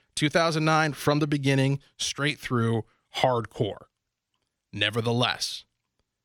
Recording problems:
none

